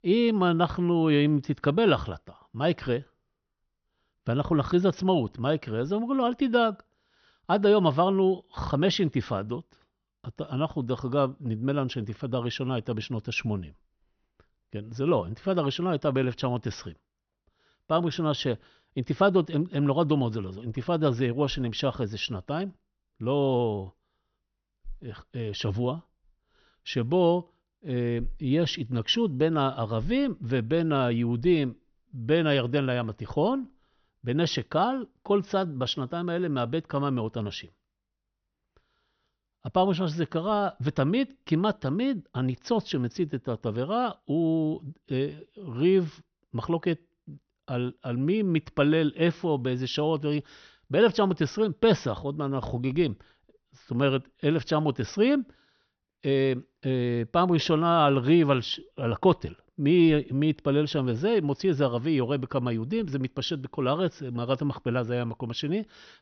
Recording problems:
high frequencies cut off; noticeable; nothing above 6 kHz

